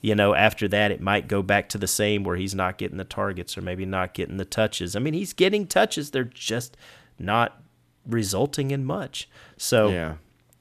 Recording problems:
none

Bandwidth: 14.5 kHz